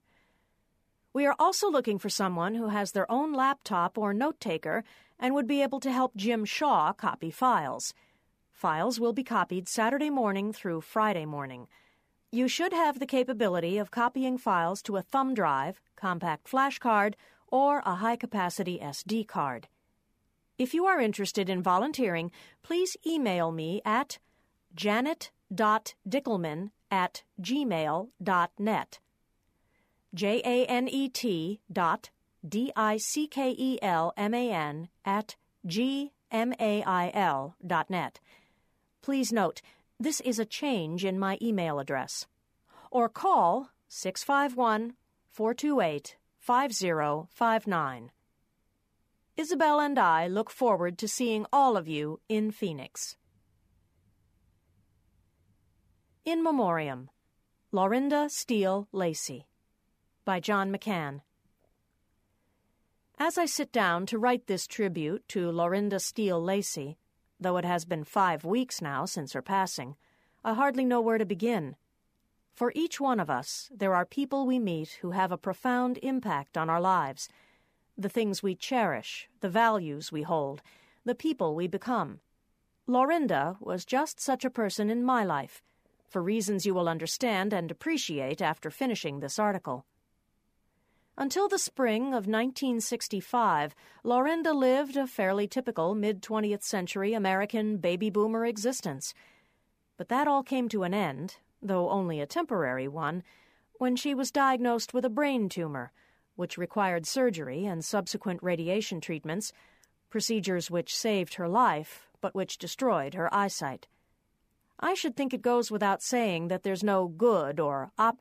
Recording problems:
none

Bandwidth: 15 kHz